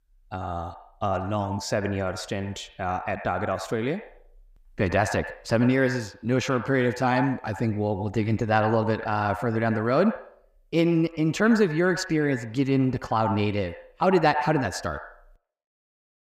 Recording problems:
echo of what is said; strong; throughout; 90 ms later, 10 dB below the speech

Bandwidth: 15.5 kHz